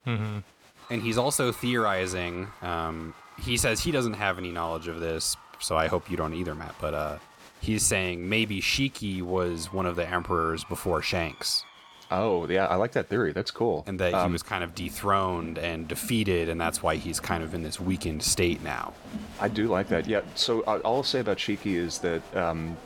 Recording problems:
crowd noise; noticeable; throughout; 20 dB below the speech

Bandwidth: 17 kHz